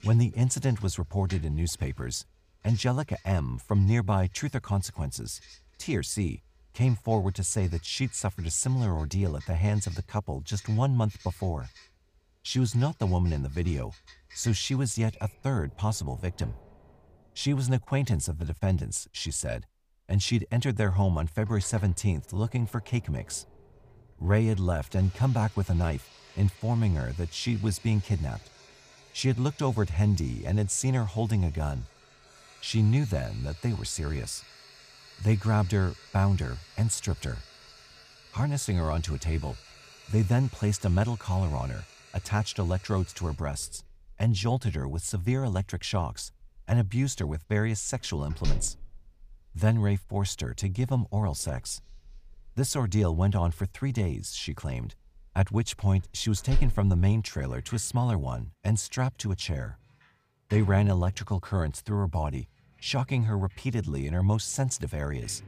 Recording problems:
household noises; faint; throughout; 20 dB below the speech

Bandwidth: 15 kHz